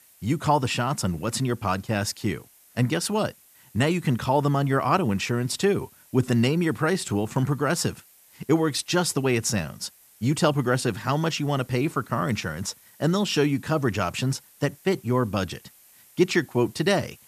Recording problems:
hiss; faint; throughout; 25 dB below the speech

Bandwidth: 14.5 kHz